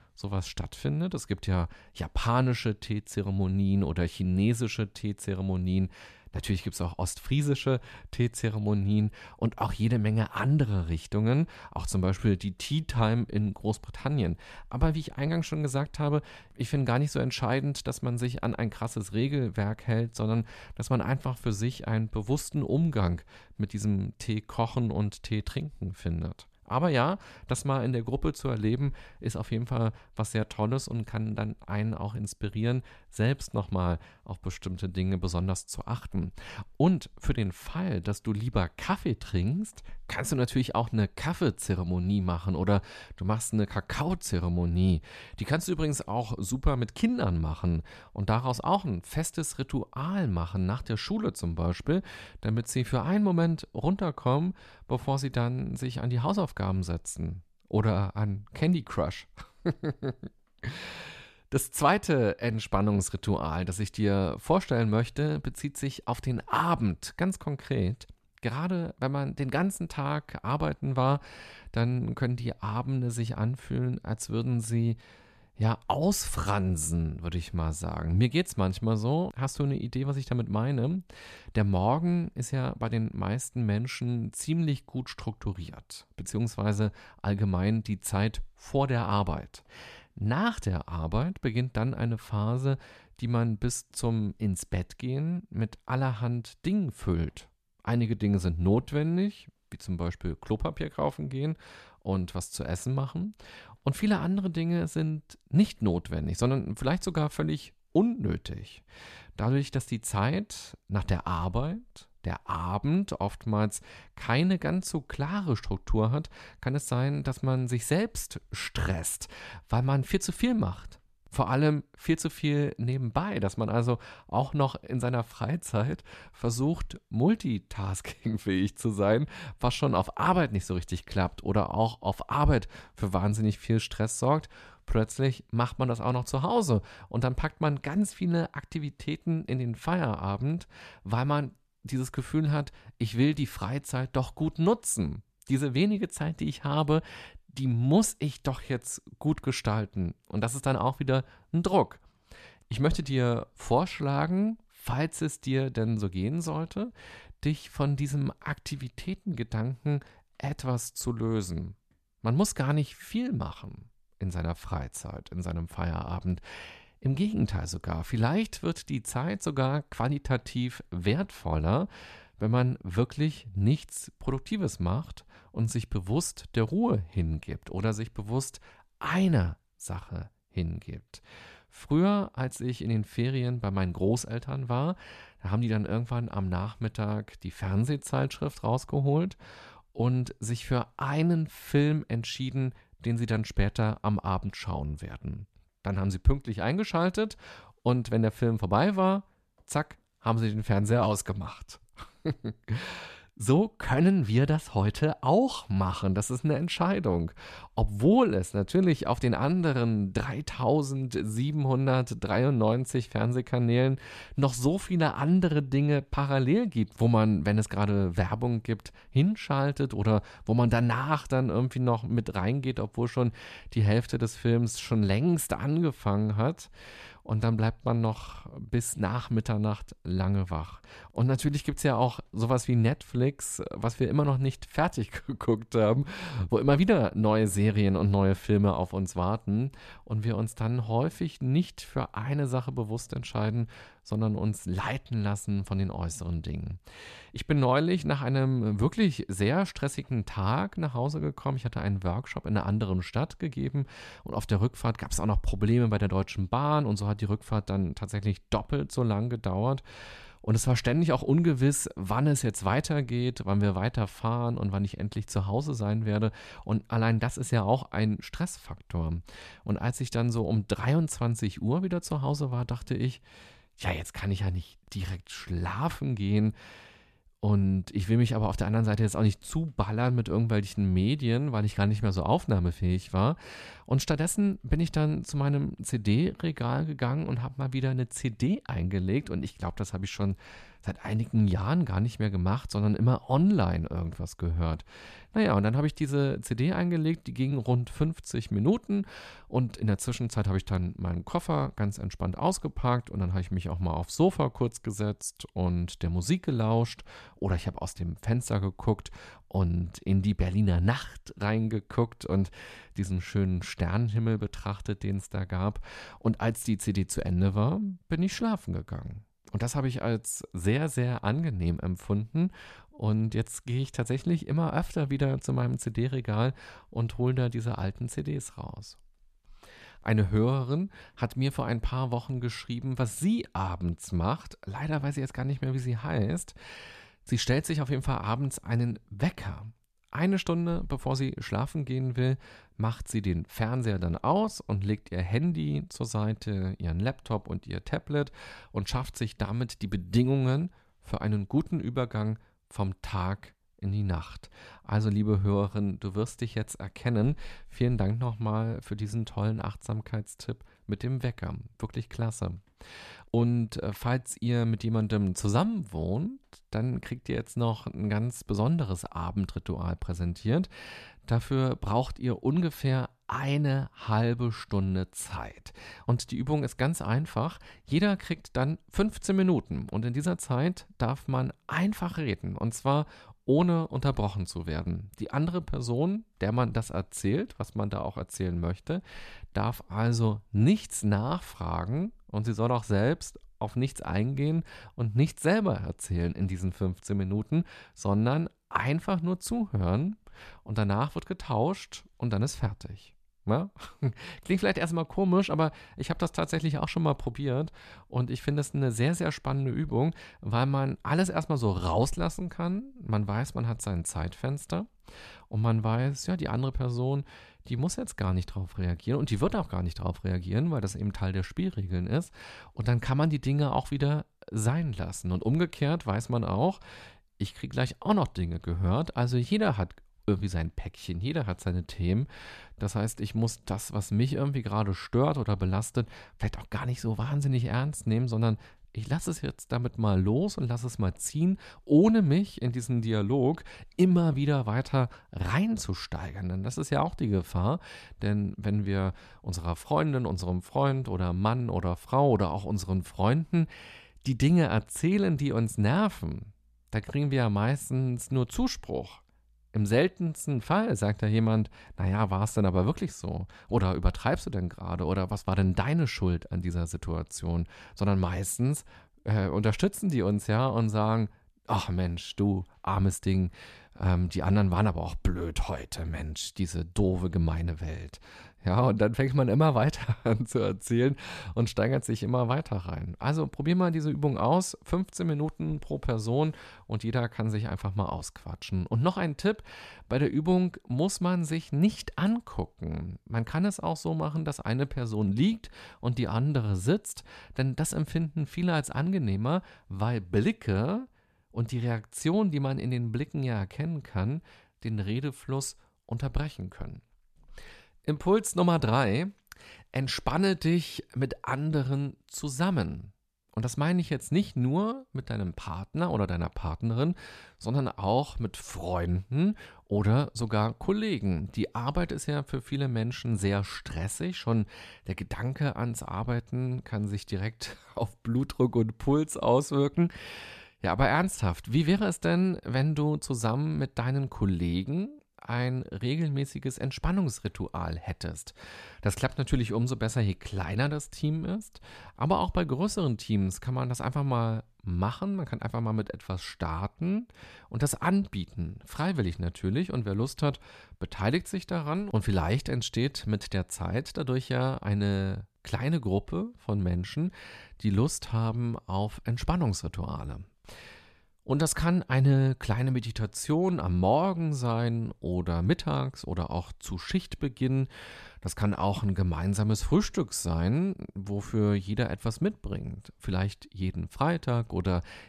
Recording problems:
none

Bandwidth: 14 kHz